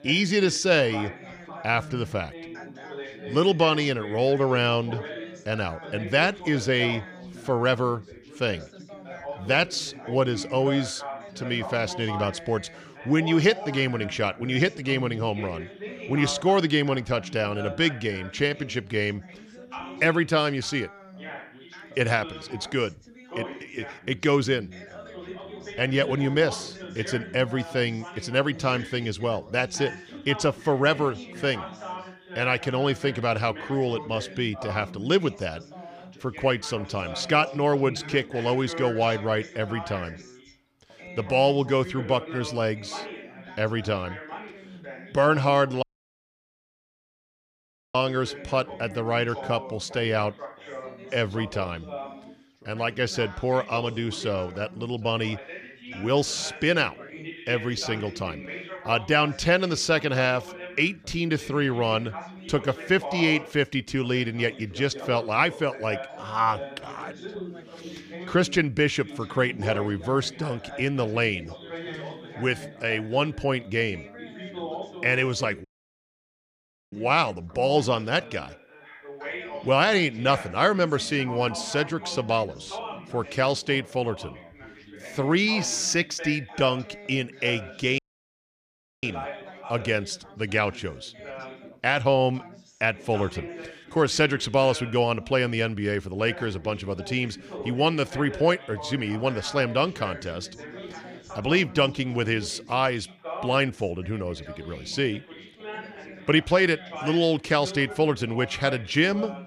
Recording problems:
background chatter; noticeable; throughout; 3 voices, 15 dB below the speech
audio cutting out; at 46 s for 2 s, at 1:16 for 1.5 s and at 1:28 for 1 s

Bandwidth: 15 kHz